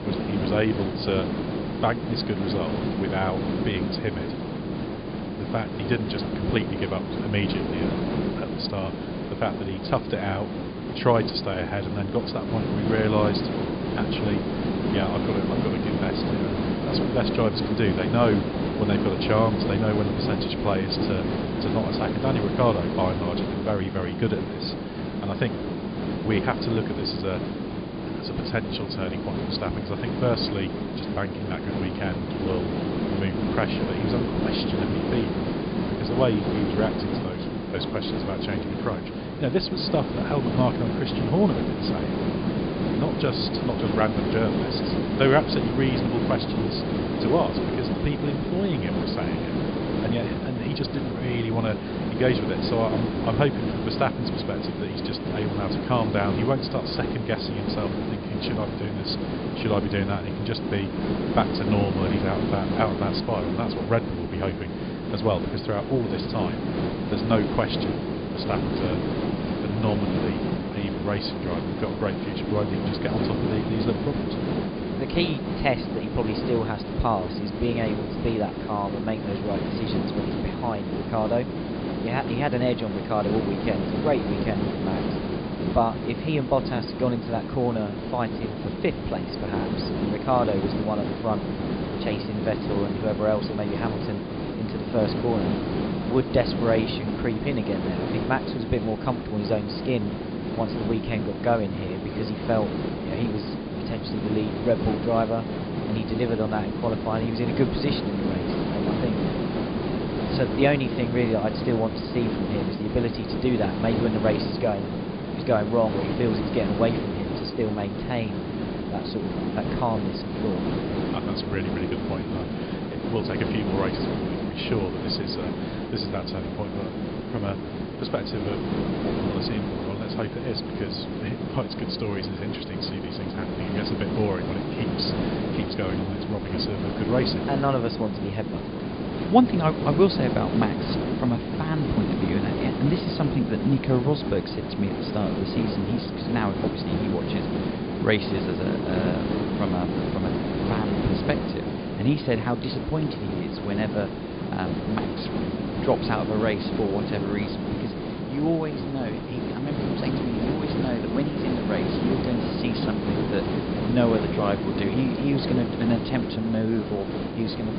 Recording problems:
high frequencies cut off; severe; nothing above 5 kHz
hiss; loud; throughout; as loud as the speech

